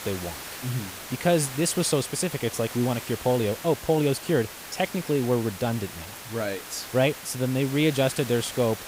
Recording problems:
hiss; noticeable; throughout; 10 dB below the speech

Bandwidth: 15.5 kHz